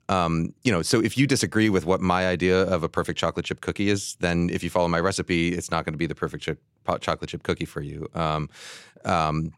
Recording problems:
none

